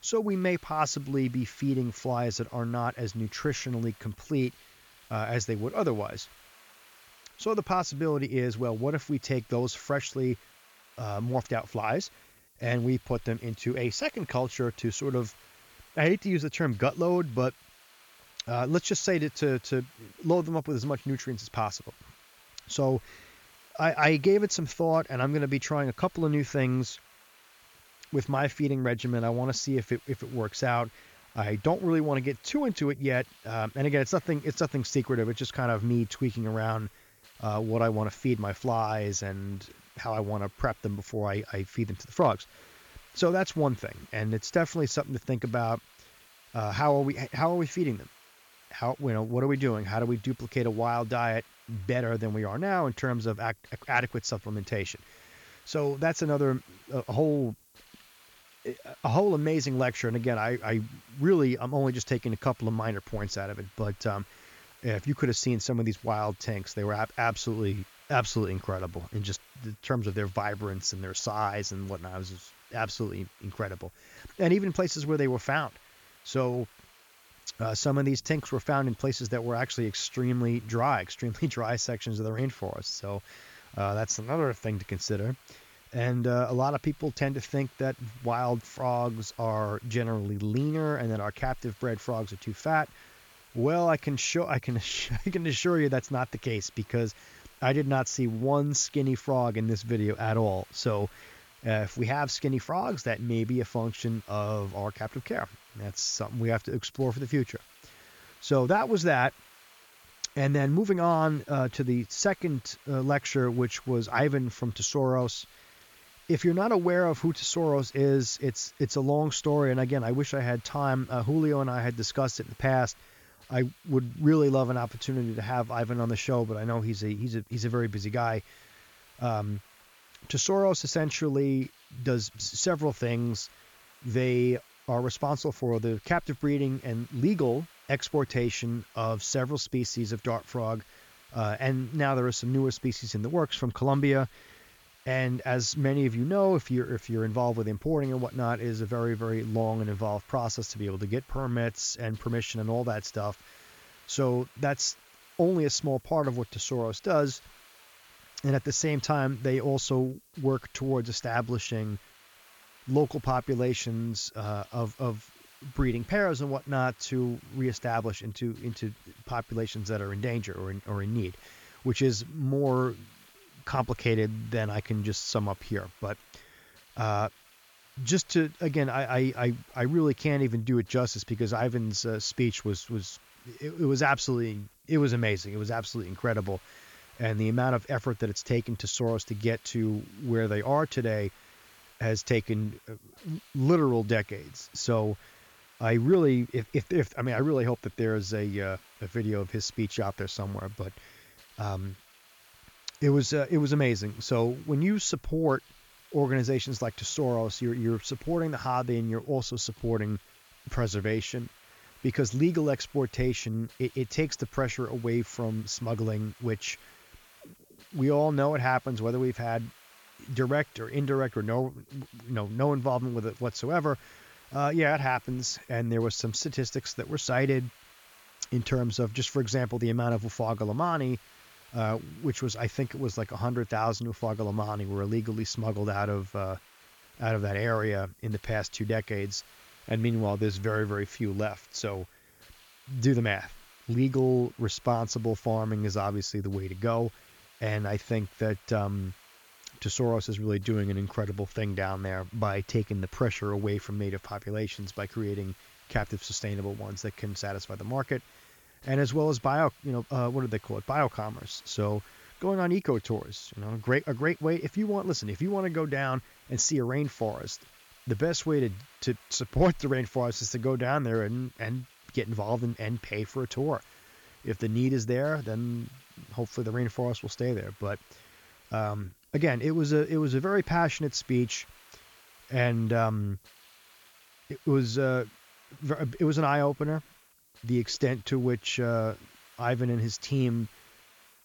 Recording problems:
high frequencies cut off; noticeable; nothing above 7 kHz
hiss; faint; throughout; 25 dB below the speech

